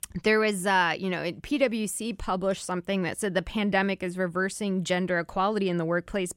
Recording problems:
none

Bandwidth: 16 kHz